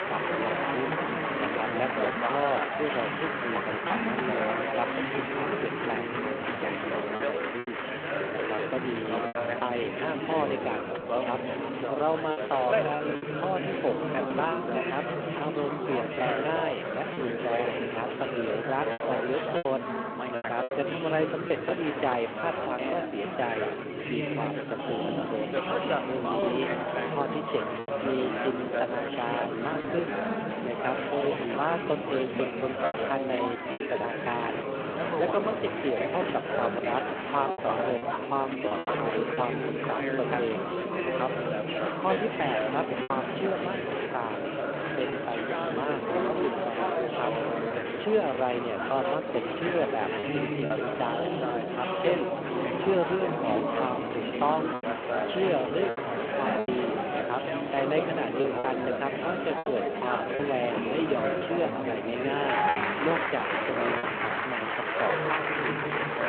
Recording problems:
phone-call audio
chatter from many people; very loud; throughout; 2 dB above the speech
traffic noise; faint; until 39 s; 25 dB below the speech
choppy; occasionally; 3% of the speech affected

